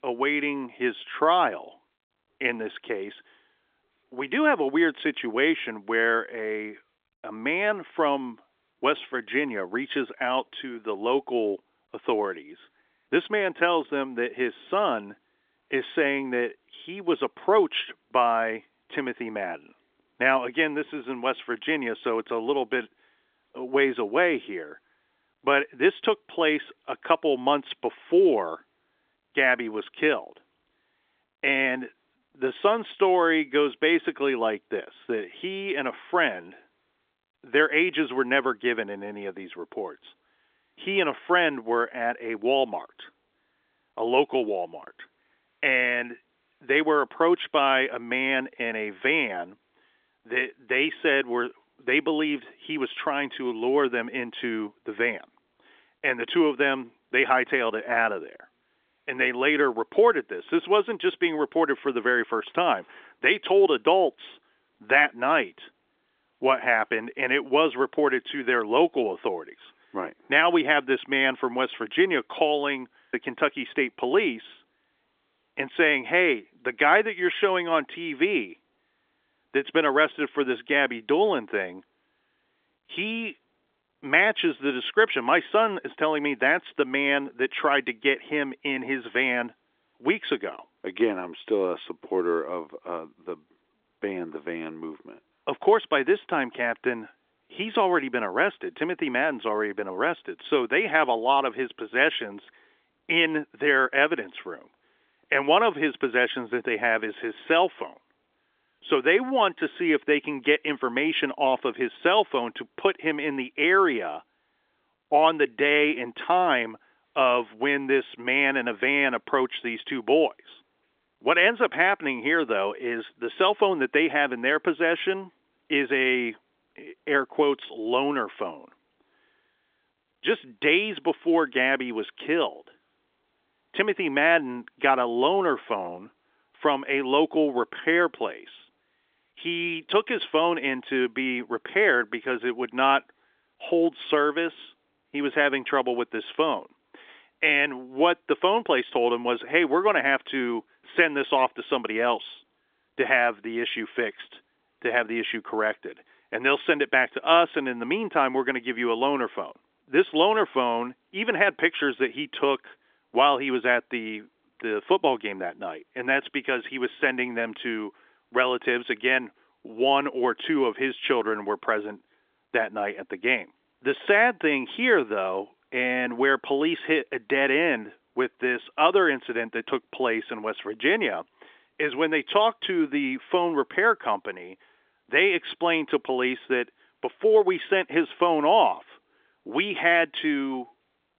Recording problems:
phone-call audio; nothing above 3.5 kHz

